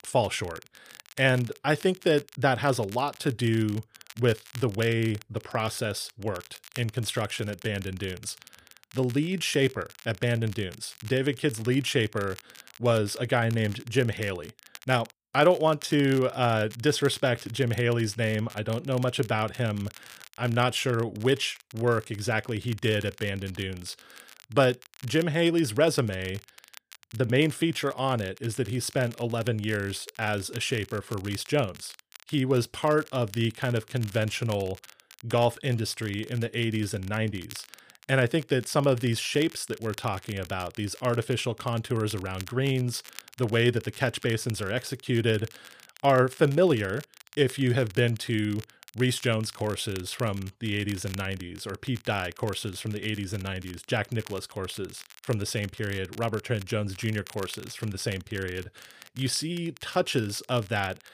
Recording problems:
crackle, like an old record; faint; 20 dB below the speech

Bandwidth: 15 kHz